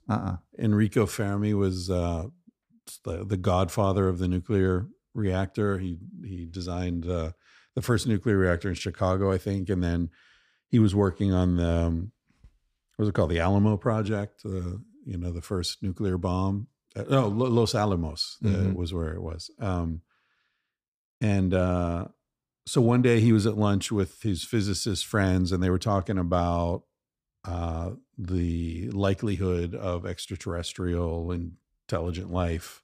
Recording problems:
none

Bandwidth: 15 kHz